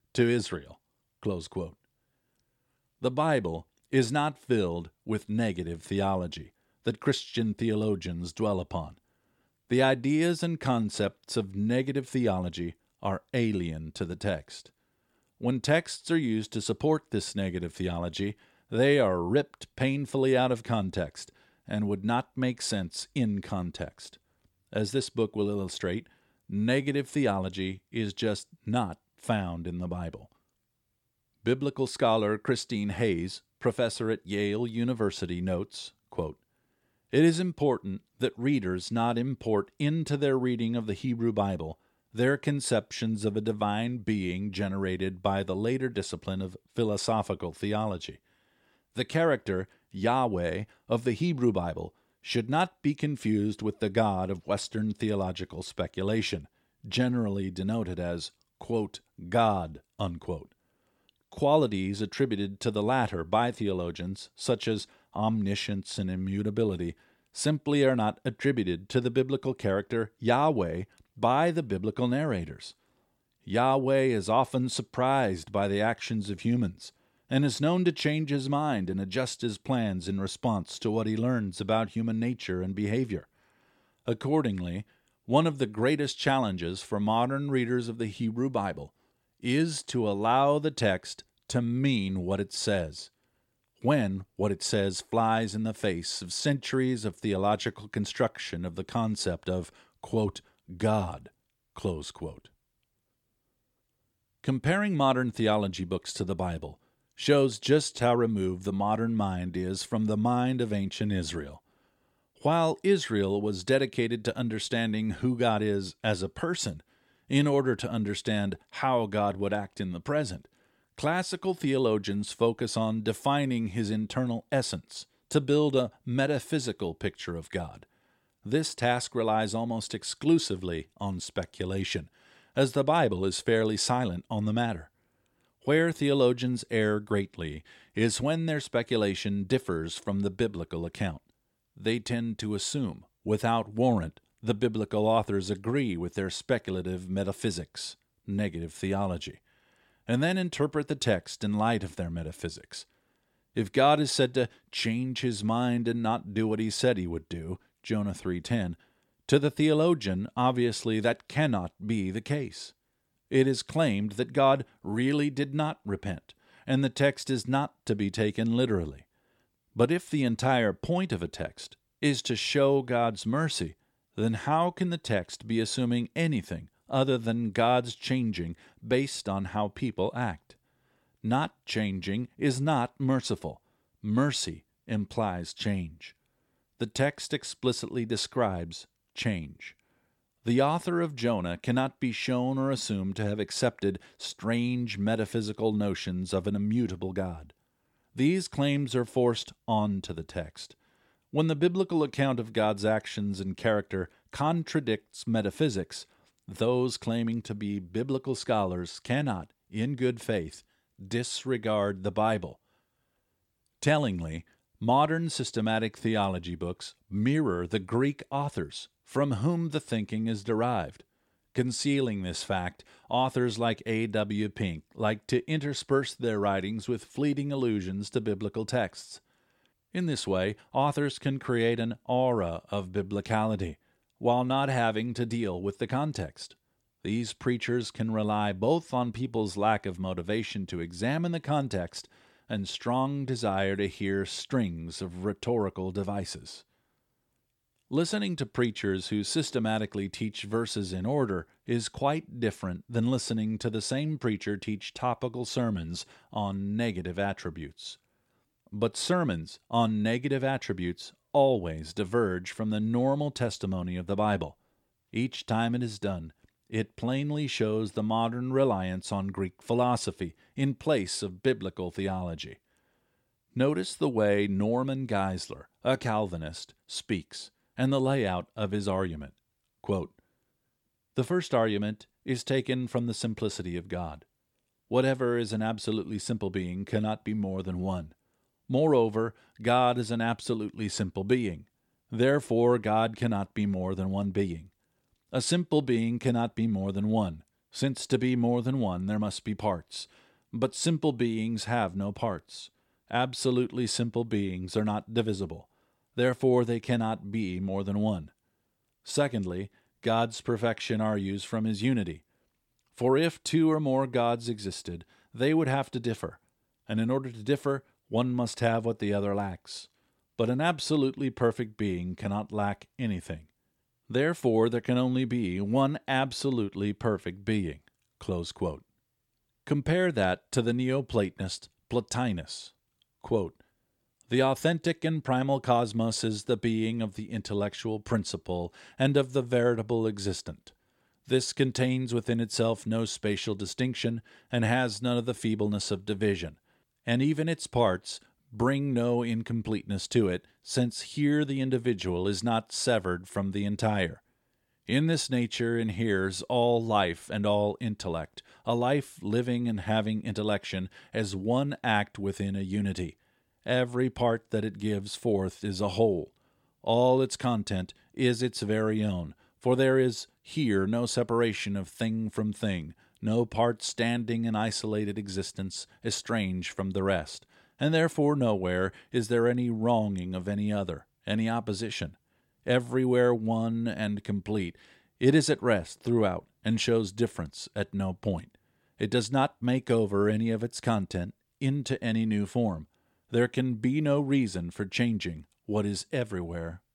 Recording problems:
none

